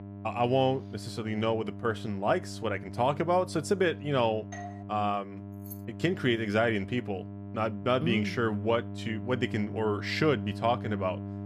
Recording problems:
electrical hum; noticeable; throughout; 50 Hz, 20 dB below the speech
doorbell; faint; at 4.5 s; peak 15 dB below the speech
jangling keys; faint; at 5.5 s; peak 20 dB below the speech

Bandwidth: 14.5 kHz